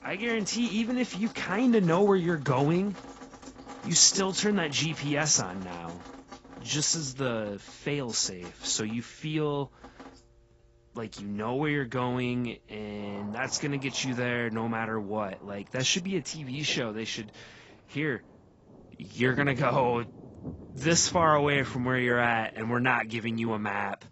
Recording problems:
garbled, watery; badly; nothing above 7.5 kHz
rain or running water; noticeable; throughout; 20 dB below the speech

